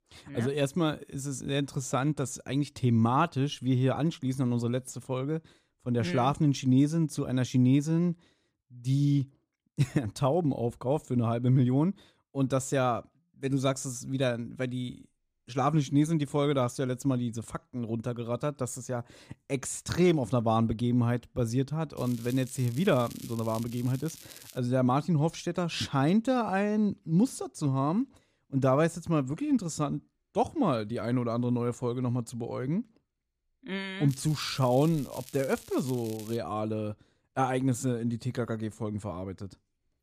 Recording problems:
crackling; noticeable; from 22 to 25 s and from 34 to 36 s; 20 dB below the speech

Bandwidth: 14.5 kHz